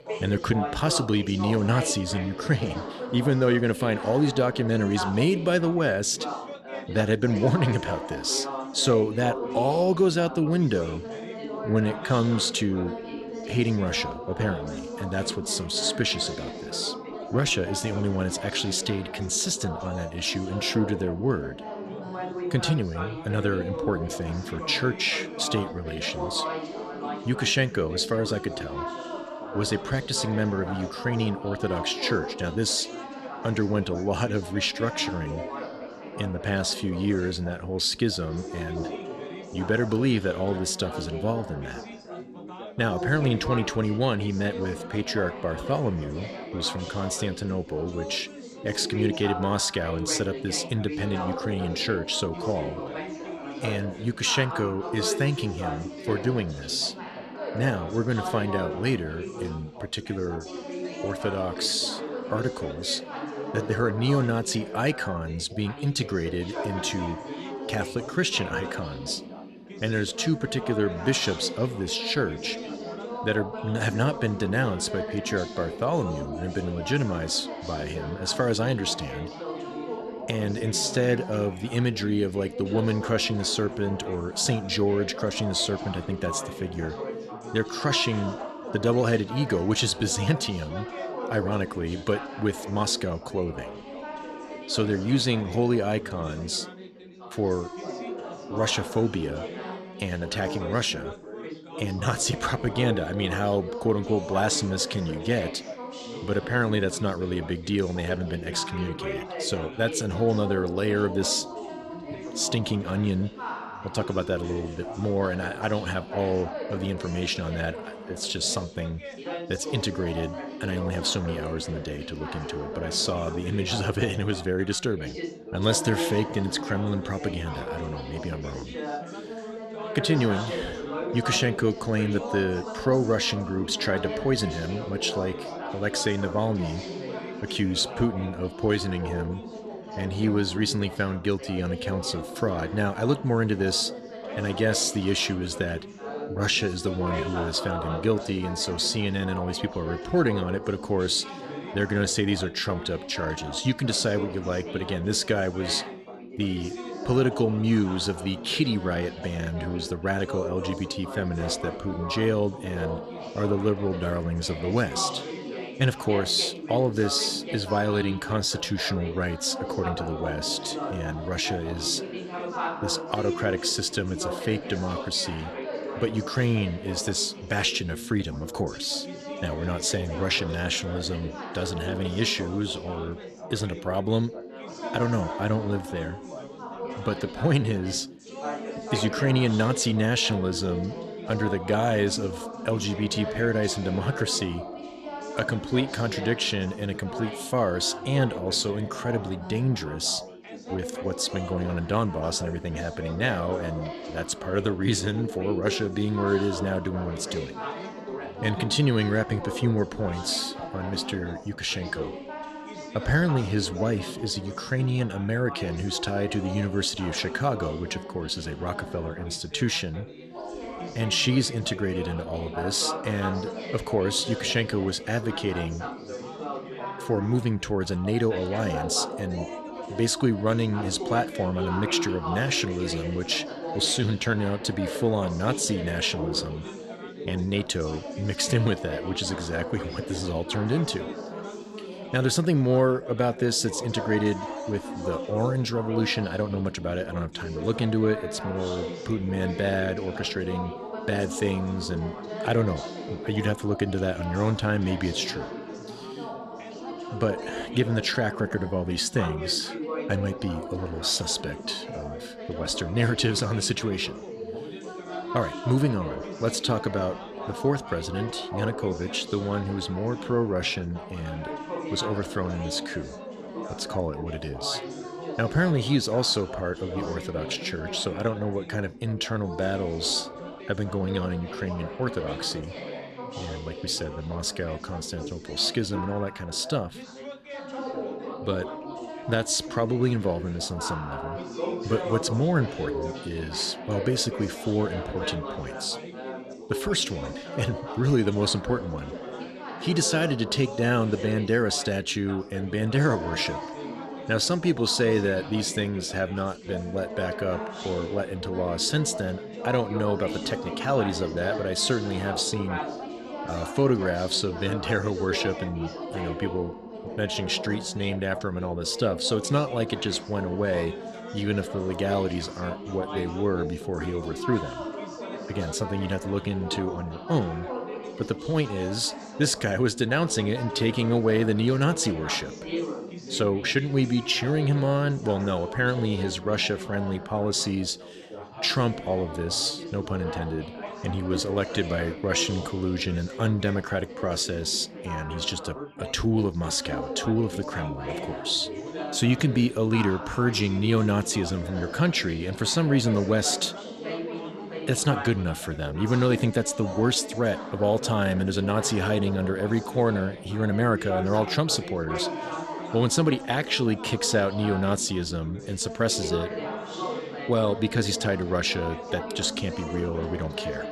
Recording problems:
background chatter; loud; throughout; 4 voices, 9 dB below the speech

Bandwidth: 14.5 kHz